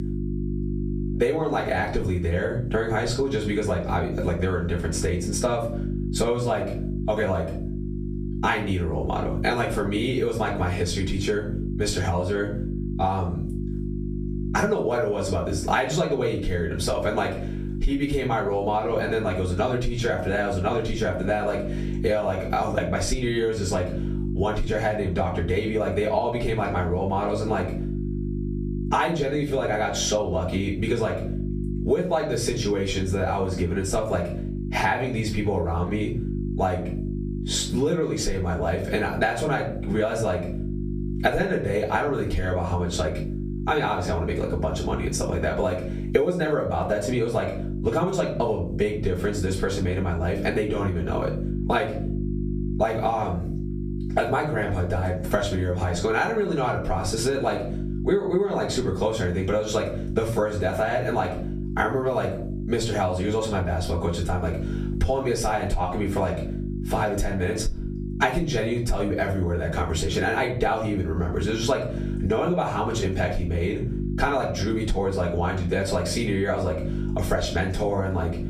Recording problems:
off-mic speech; far
room echo; slight; dies away in 0.3 s
squashed, flat; somewhat
electrical hum; noticeable; throughout; 50 Hz, 15 dB below the speech

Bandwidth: 15 kHz